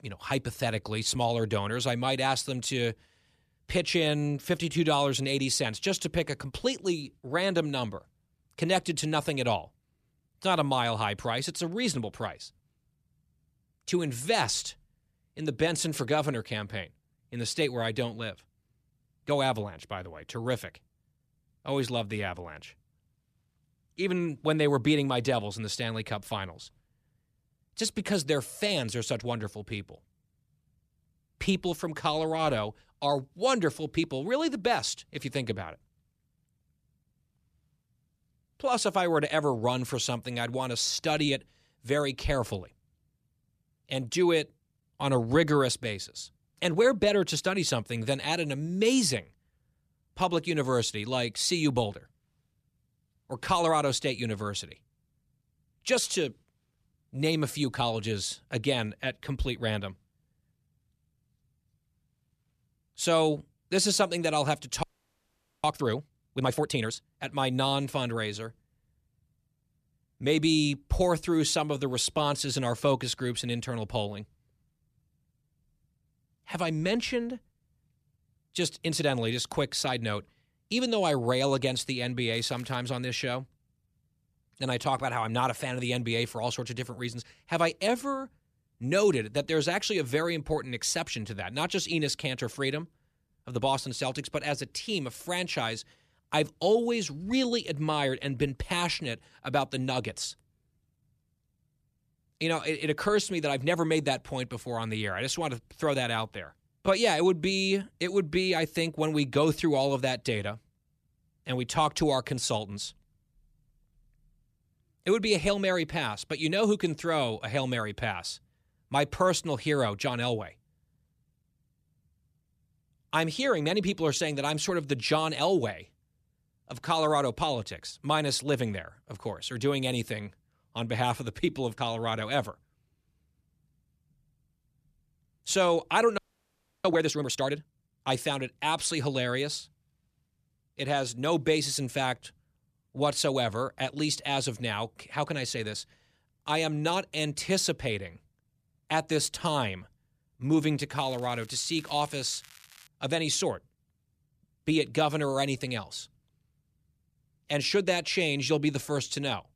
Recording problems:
crackling; faint; at 1:22 and from 2:31 to 2:33; 25 dB below the speech
audio freezing; at 1:05 for 1 s and at 2:16 for 0.5 s

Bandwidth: 14.5 kHz